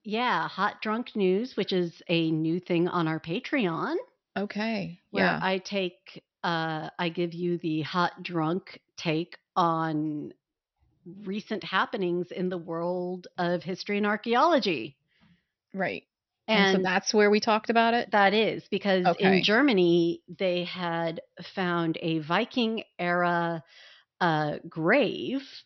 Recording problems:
high frequencies cut off; noticeable; nothing above 5.5 kHz

